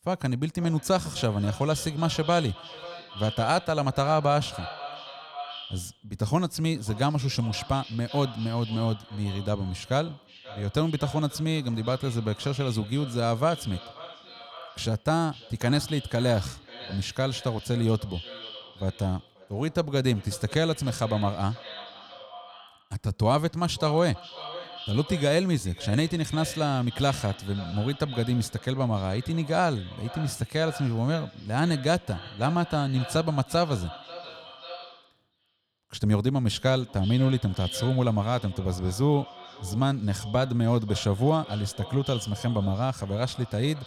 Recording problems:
echo of what is said; noticeable; throughout; 530 ms later, 15 dB below the speech

